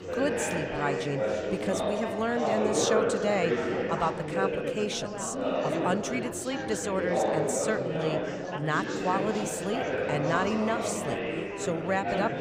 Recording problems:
chatter from many people; very loud; throughout; 1 dB above the speech

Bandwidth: 15.5 kHz